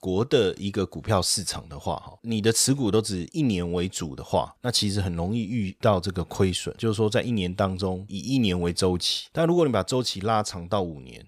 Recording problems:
none

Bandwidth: 15 kHz